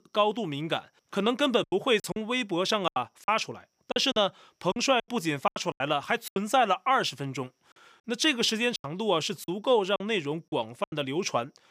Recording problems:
choppy; very; 10% of the speech affected

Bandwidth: 15 kHz